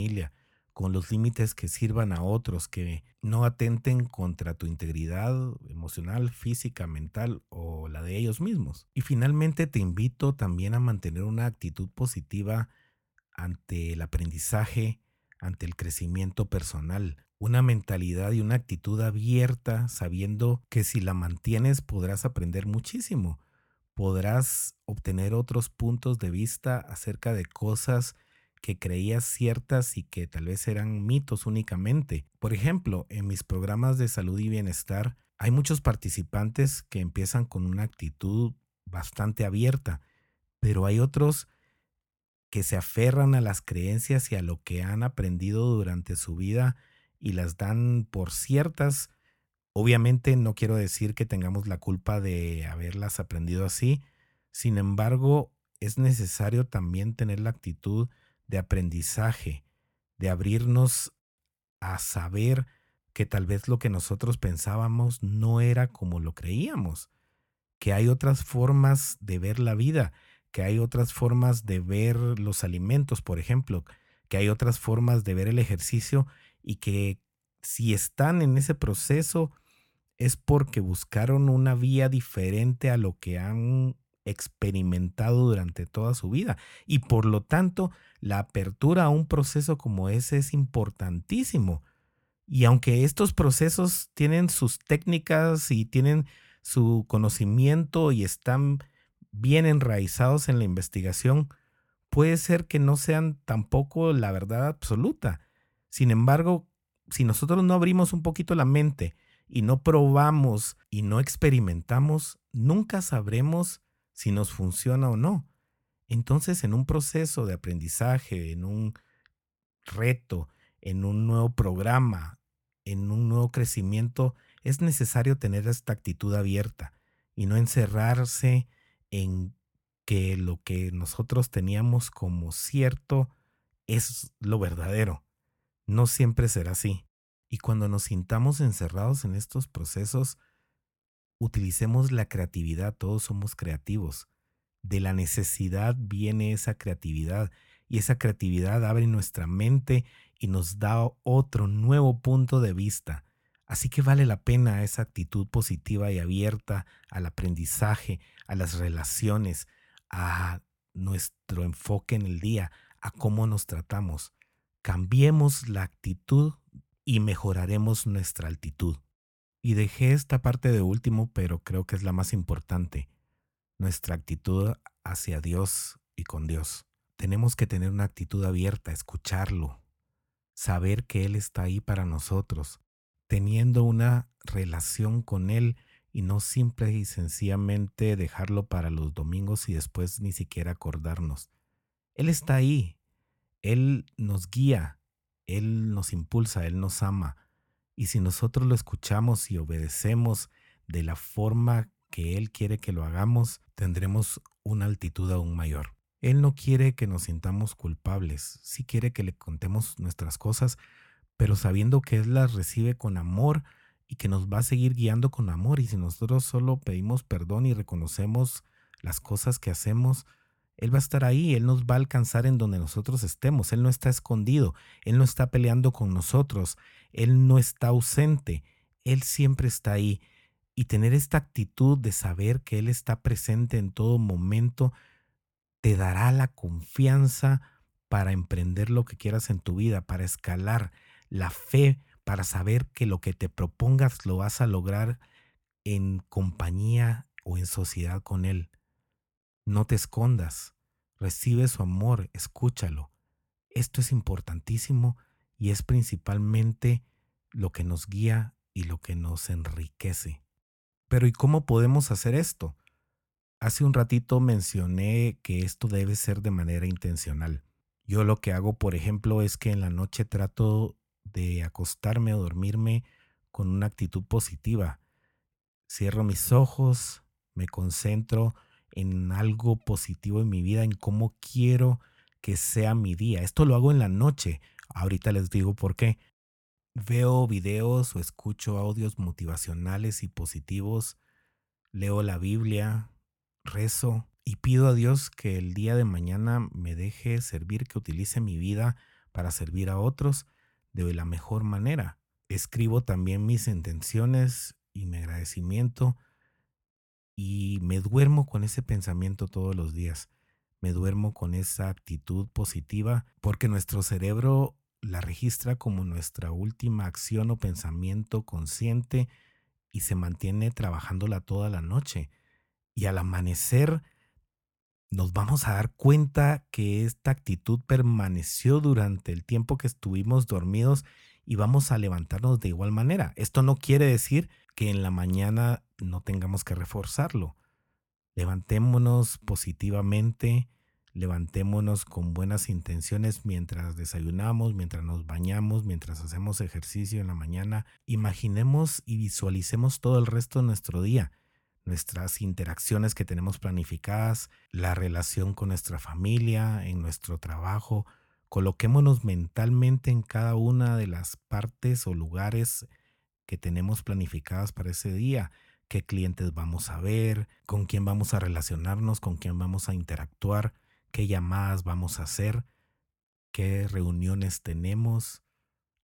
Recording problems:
abrupt cut into speech; at the start

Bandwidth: 17.5 kHz